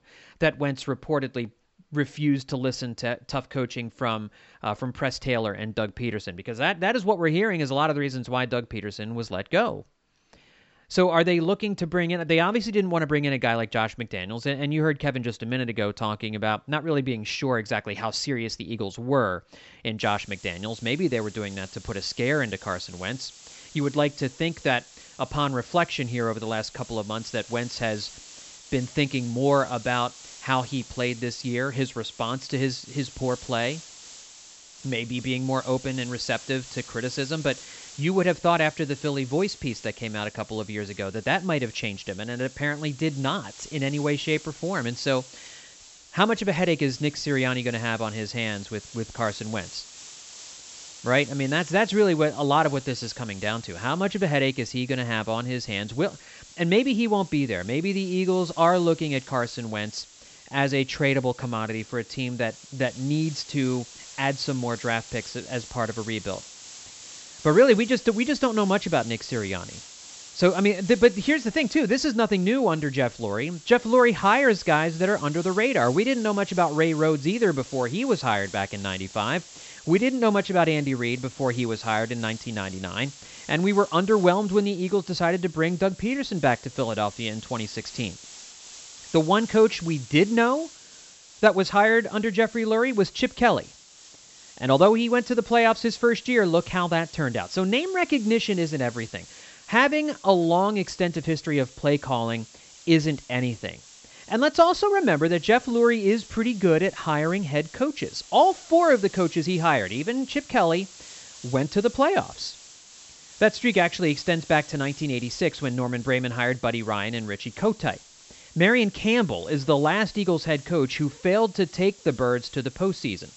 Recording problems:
high frequencies cut off; noticeable; nothing above 8 kHz
hiss; noticeable; from 20 s on; 20 dB below the speech

